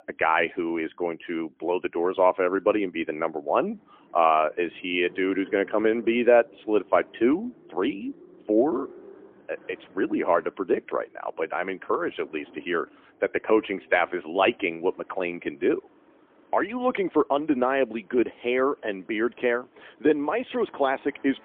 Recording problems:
phone-call audio; poor line; nothing above 3 kHz
traffic noise; faint; throughout; 25 dB below the speech

